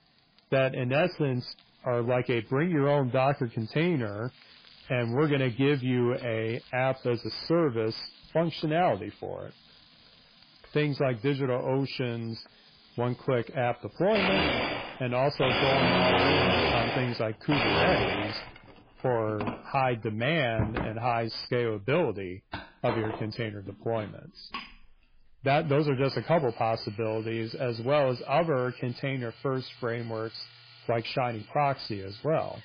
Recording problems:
garbled, watery; badly; nothing above 5 kHz
distortion; slight; 10 dB below the speech
household noises; very loud; throughout; 1 dB above the speech

